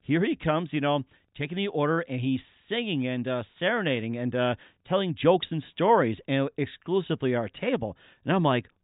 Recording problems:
high frequencies cut off; severe; nothing above 4 kHz

